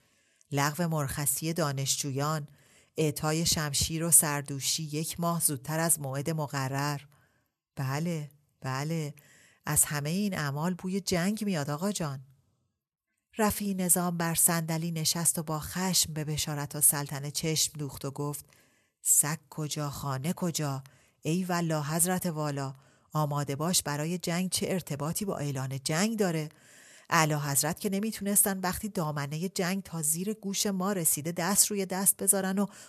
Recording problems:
none

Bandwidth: 13.5 kHz